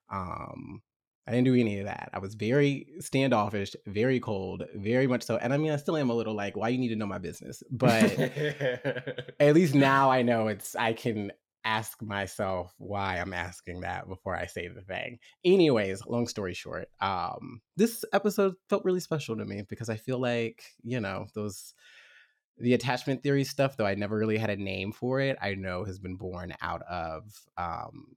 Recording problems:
none

